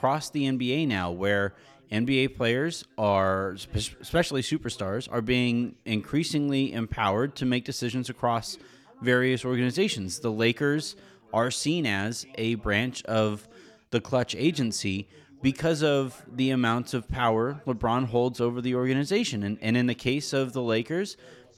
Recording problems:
background chatter; faint; throughout; 3 voices, 30 dB below the speech

